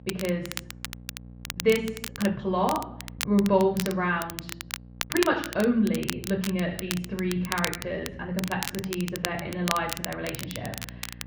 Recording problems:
muffled; very; fading above 2.5 kHz
room echo; slight; dies away in 0.6 s
off-mic speech; somewhat distant
crackle, like an old record; loud; 8 dB below the speech
electrical hum; faint; throughout; 60 Hz, 25 dB below the speech
uneven, jittery; strongly; from 1.5 to 10 s

